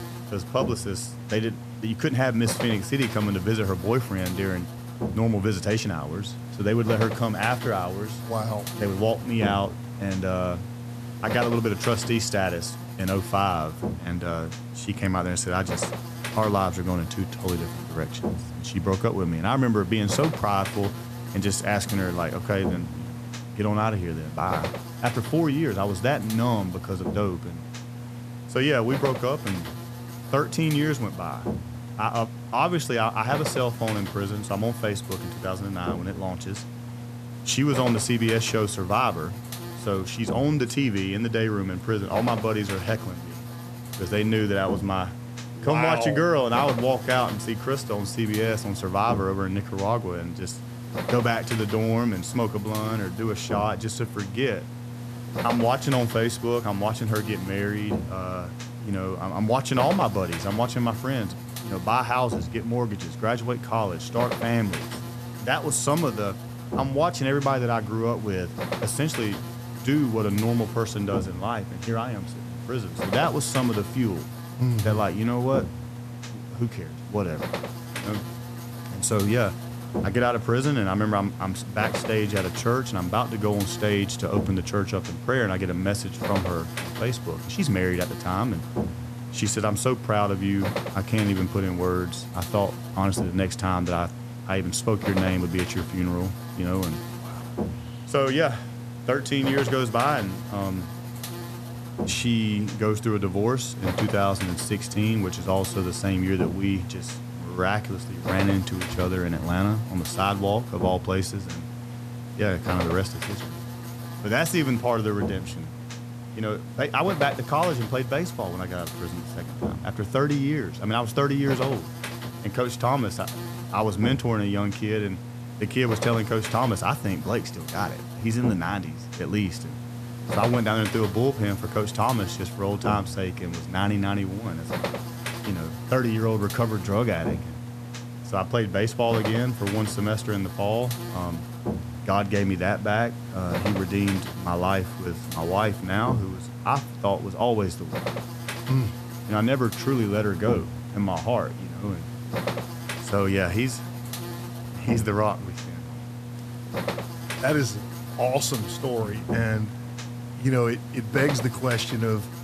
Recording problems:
electrical hum; loud; throughout; 60 Hz, 10 dB below the speech

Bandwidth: 14.5 kHz